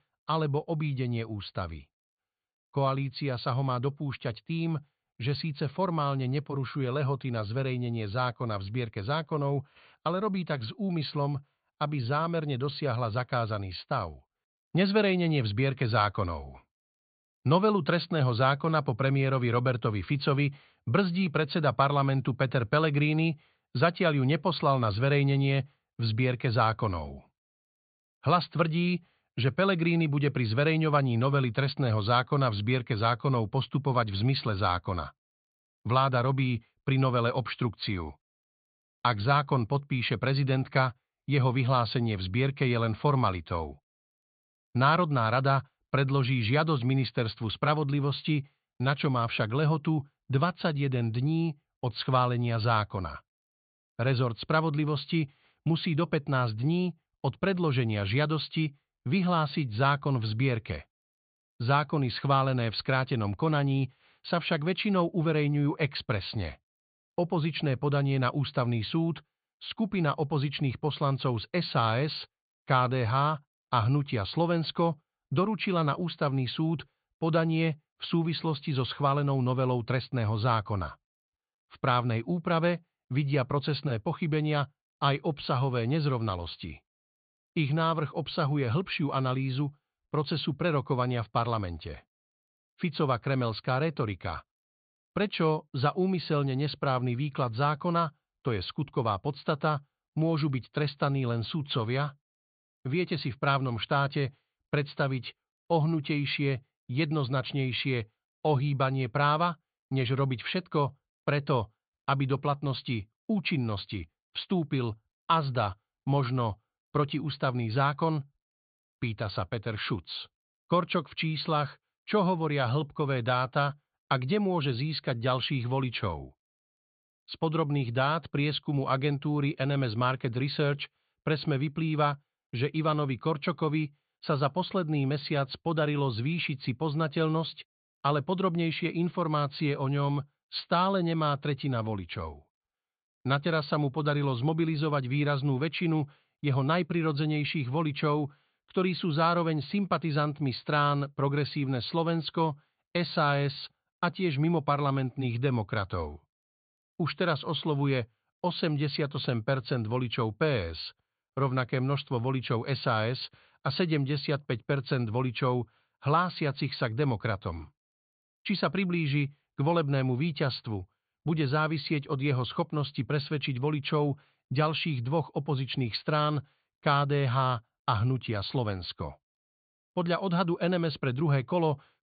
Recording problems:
high frequencies cut off; severe; nothing above 4.5 kHz

